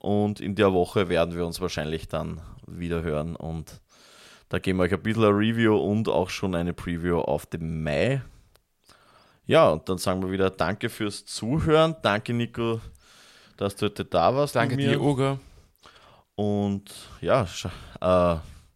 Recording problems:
none

